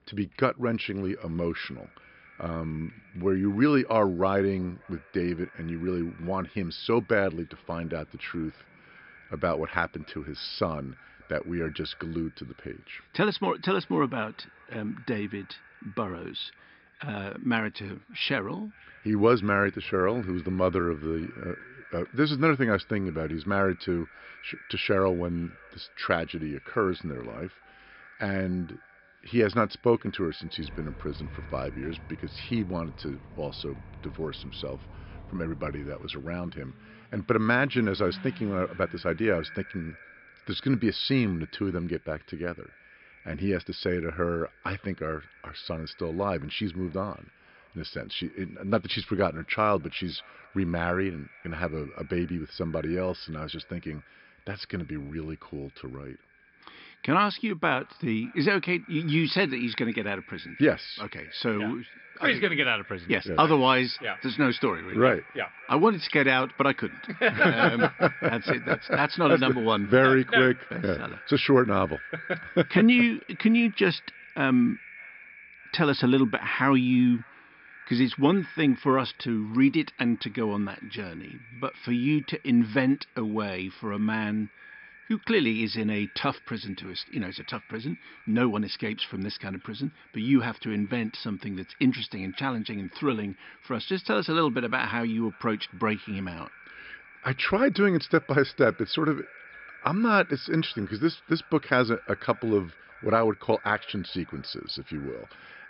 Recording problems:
high frequencies cut off; noticeable; nothing above 5 kHz
echo of what is said; faint; throughout; 590 ms later, 20 dB below the speech
traffic noise; faint; until 42 s; 20 dB below the speech

